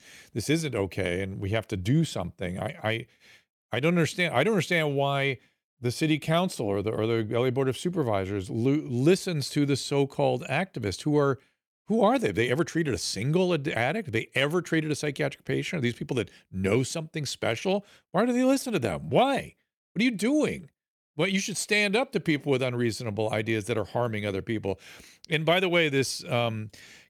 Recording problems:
none

